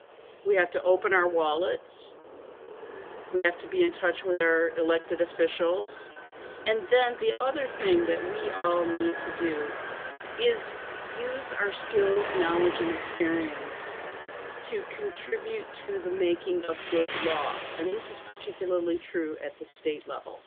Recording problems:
phone-call audio; nothing above 3.5 kHz
traffic noise; loud; throughout; 9 dB below the speech
choppy; very; 7% of the speech affected

